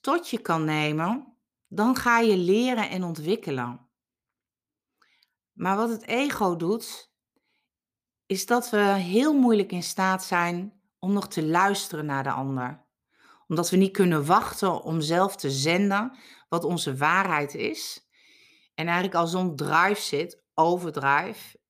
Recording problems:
none

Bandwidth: 15 kHz